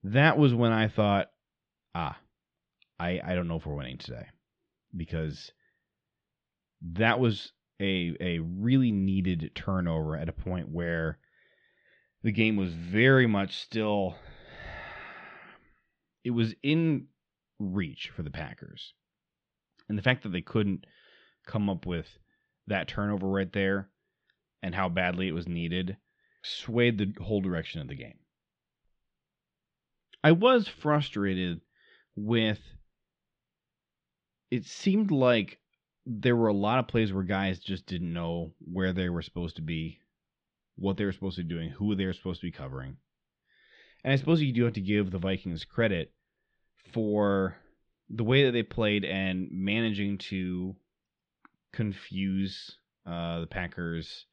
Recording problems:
muffled; slightly; fading above 3.5 kHz

